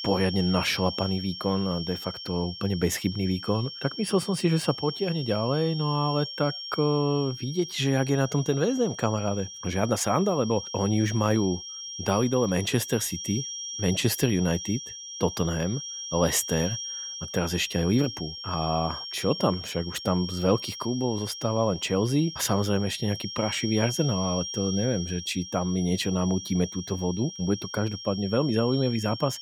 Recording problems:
high-pitched whine; loud; throughout; 5.5 kHz, 8 dB below the speech

